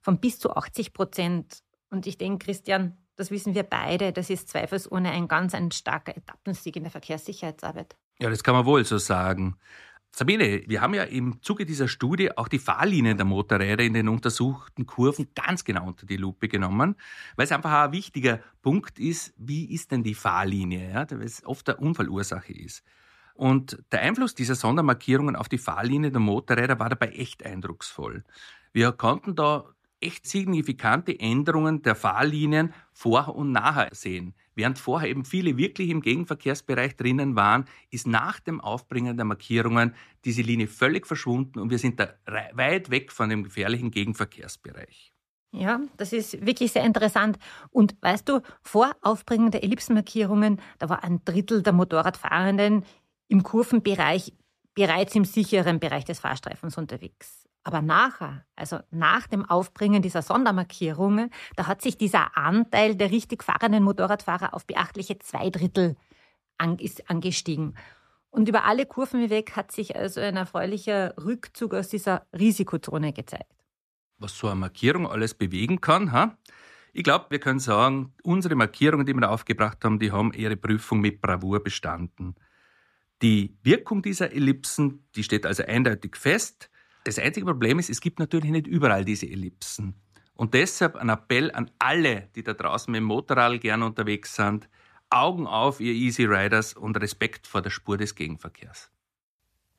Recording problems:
none

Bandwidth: 14.5 kHz